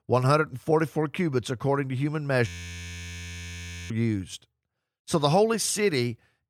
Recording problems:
audio freezing; at 2.5 s for 1.5 s

